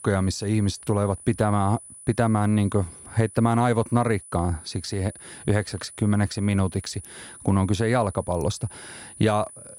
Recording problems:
high-pitched whine; noticeable; throughout; 10 kHz, 15 dB below the speech

